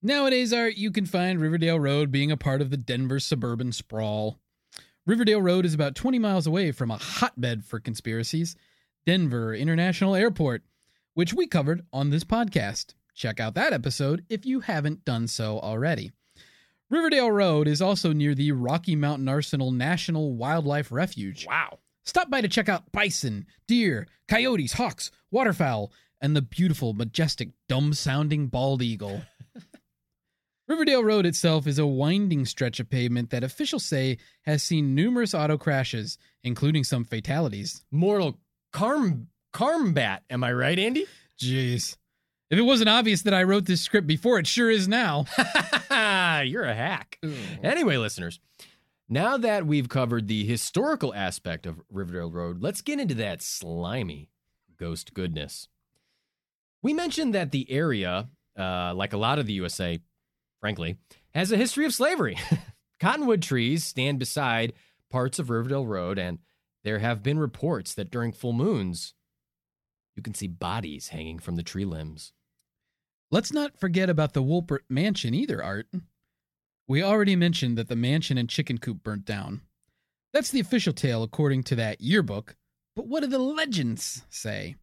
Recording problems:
none

